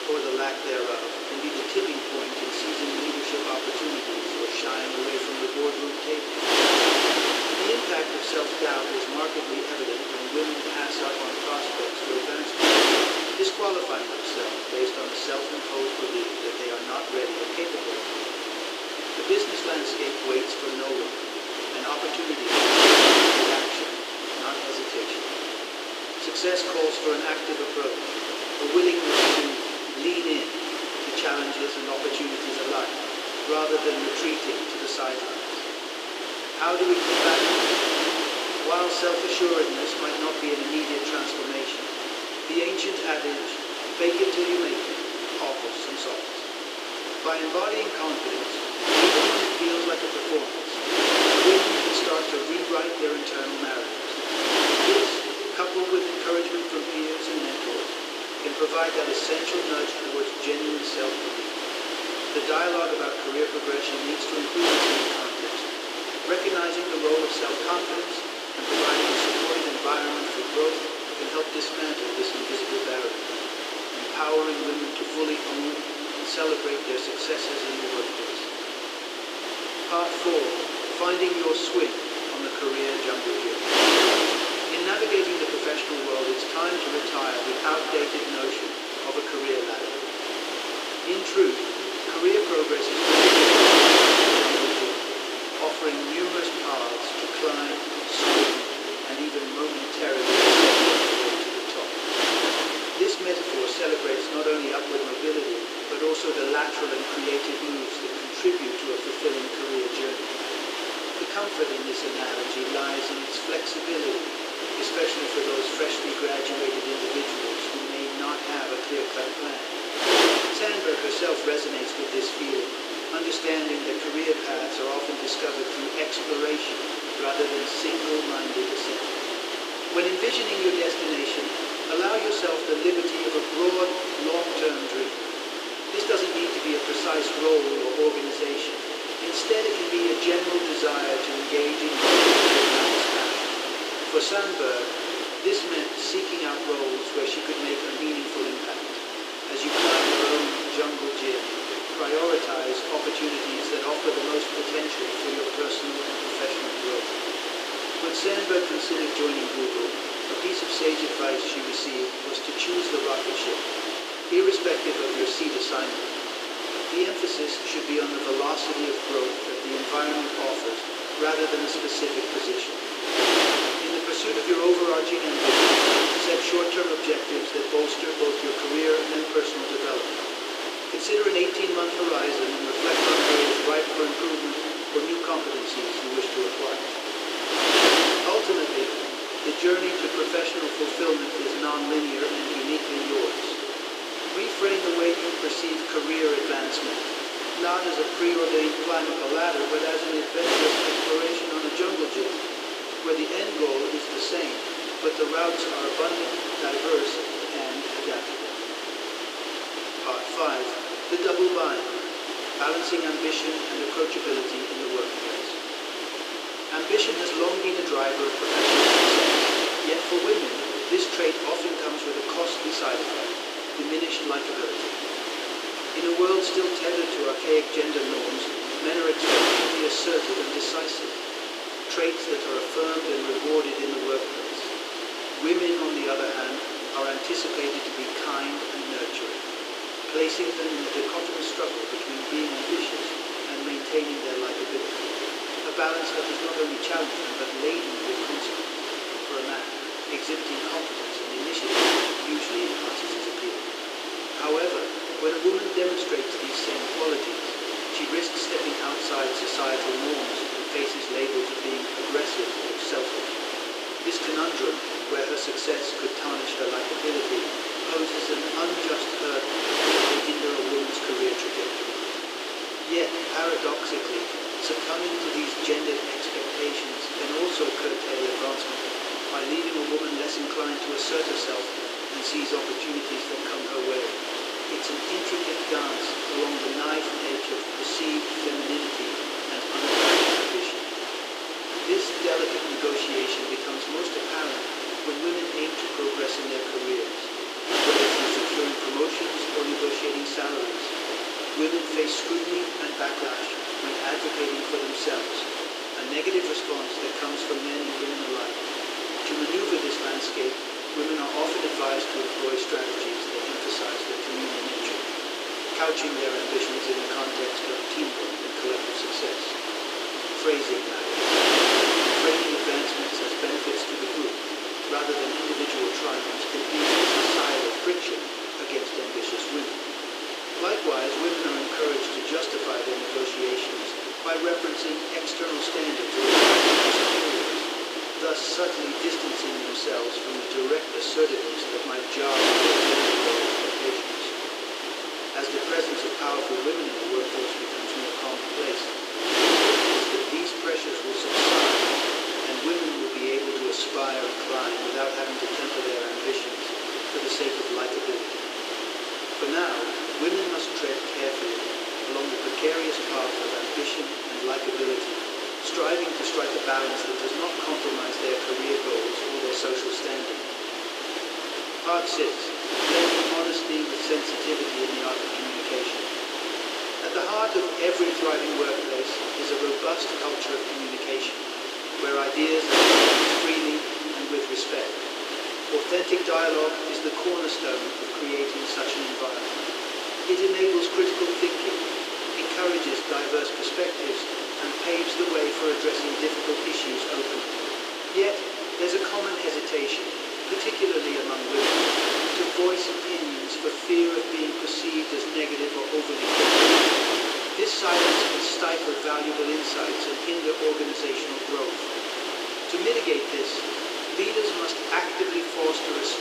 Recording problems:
room echo; noticeable; dies away in 2.4 s
thin; somewhat; fading below 350 Hz
off-mic speech; somewhat distant
wind noise on the microphone; heavy; 2 dB above the speech

